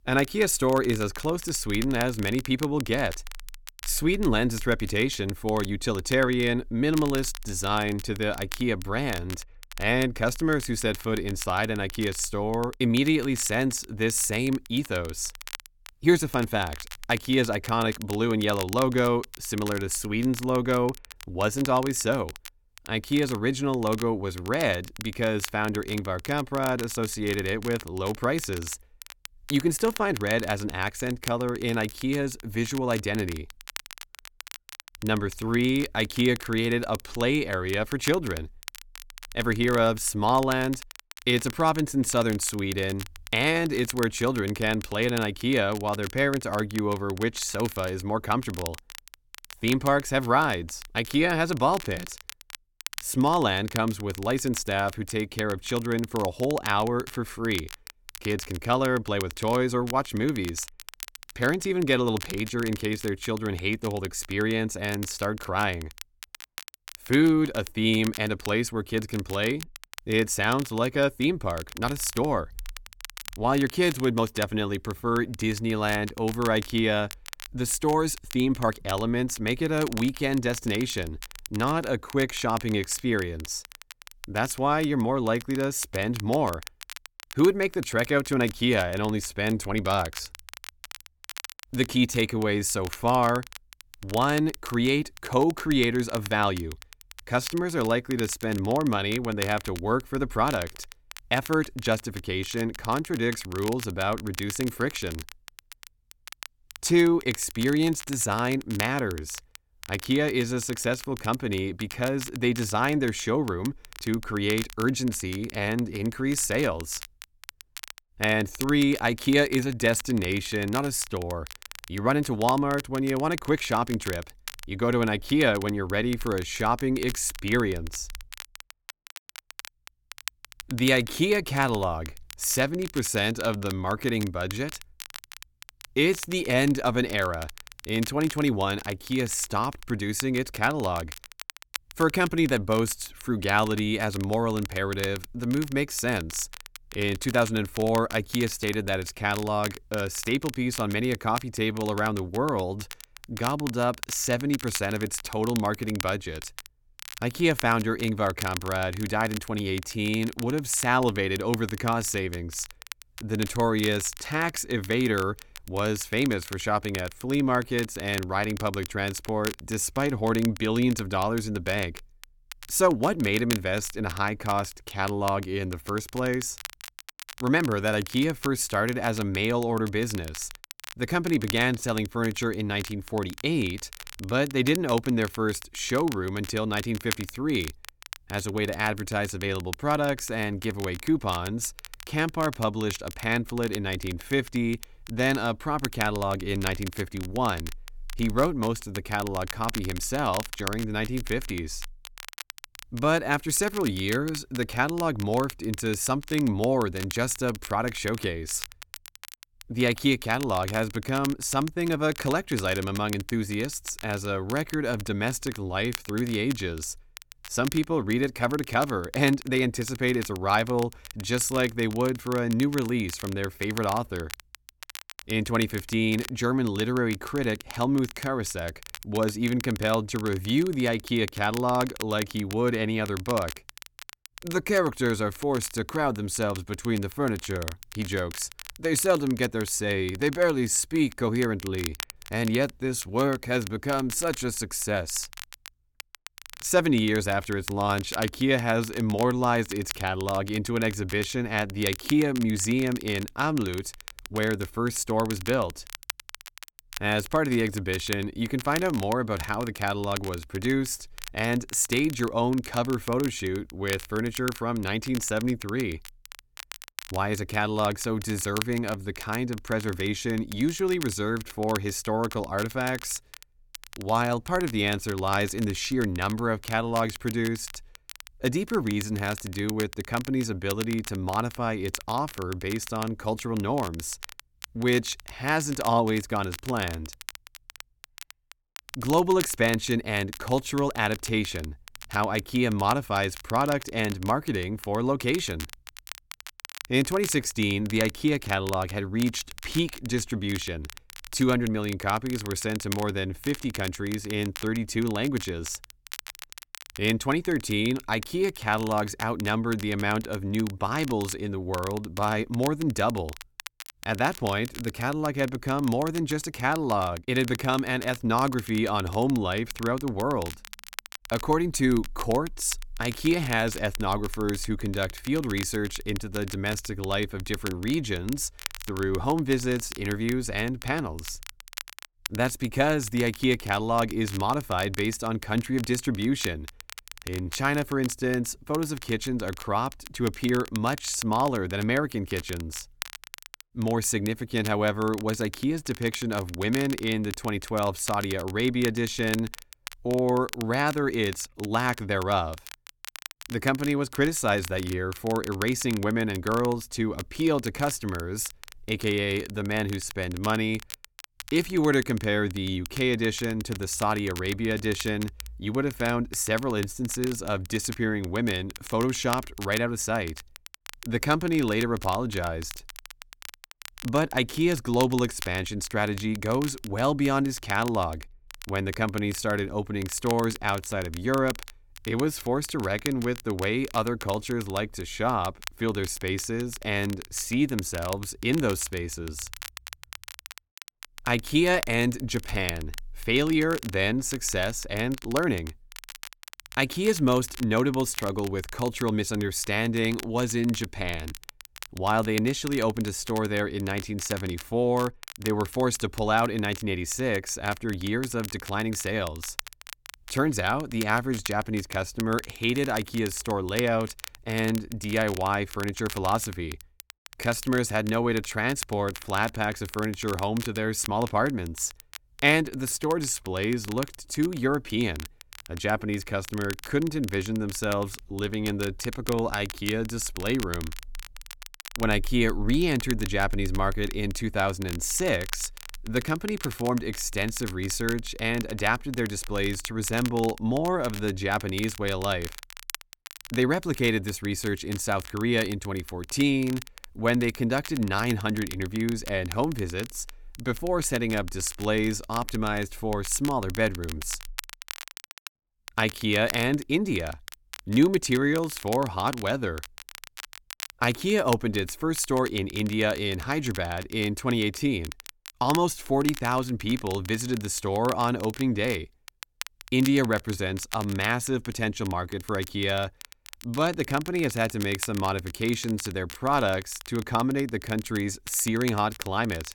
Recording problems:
crackle, like an old record; noticeable; 15 dB below the speech

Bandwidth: 18 kHz